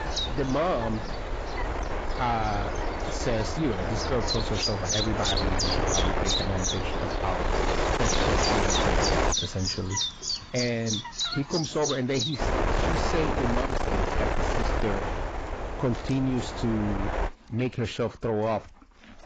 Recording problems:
garbled, watery; badly; nothing above 7.5 kHz
distortion; slight; 10 dB below the speech
wind noise on the microphone; heavy; until 9.5 s and from 12 to 17 s; 2 dB above the speech
animal sounds; loud; throughout; as loud as the speech

